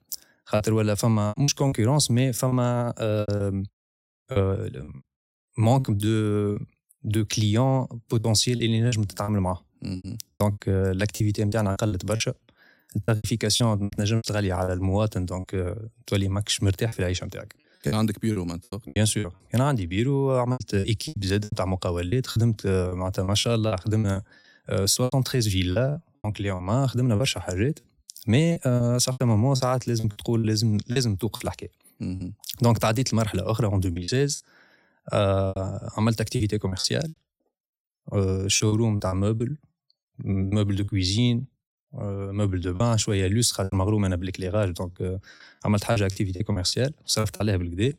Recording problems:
choppy; very; 11% of the speech affected

